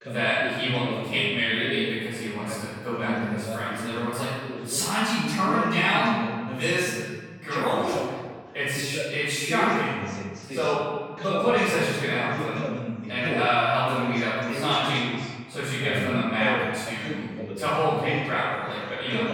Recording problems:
room echo; strong; dies away in 1.6 s
off-mic speech; far
voice in the background; loud; throughout; 9 dB below the speech

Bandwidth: 18 kHz